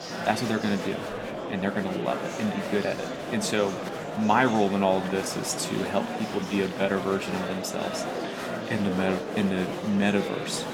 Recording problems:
murmuring crowd; loud; throughout; 5 dB below the speech

